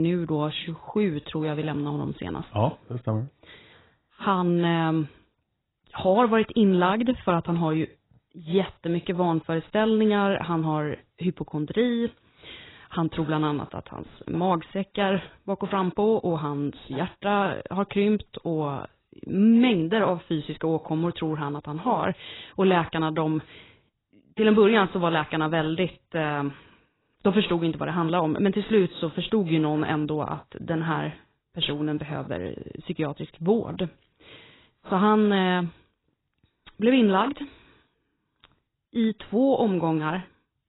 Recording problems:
garbled, watery; badly; nothing above 4 kHz
abrupt cut into speech; at the start

